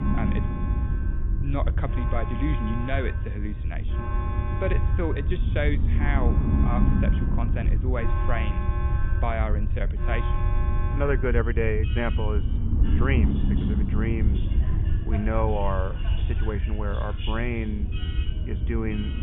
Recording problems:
high frequencies cut off; severe; nothing above 3.5 kHz
alarms or sirens; loud; throughout; 8 dB below the speech
low rumble; loud; throughout; 8 dB below the speech
animal sounds; faint; throughout; 20 dB below the speech

